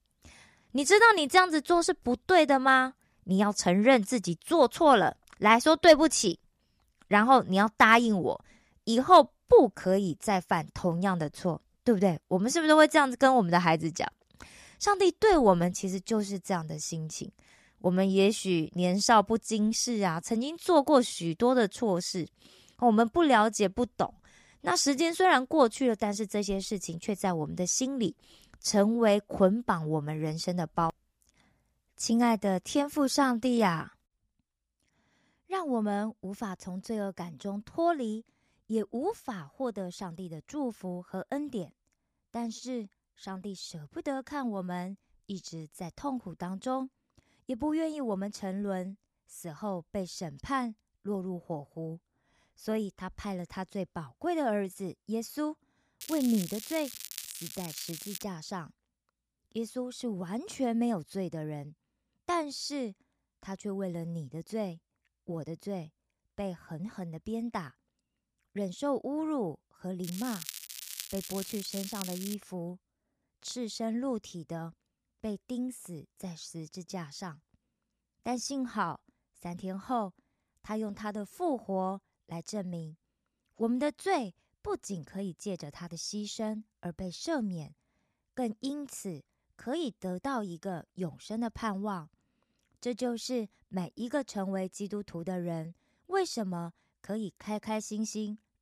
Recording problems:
crackling; noticeable; from 56 to 58 s and from 1:10 to 1:12; 10 dB below the speech

